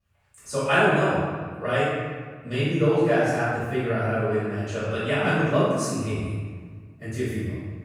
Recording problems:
room echo; strong; dies away in 1.4 s
off-mic speech; far
echo of what is said; faint; throughout; 180 ms later, 20 dB below the speech

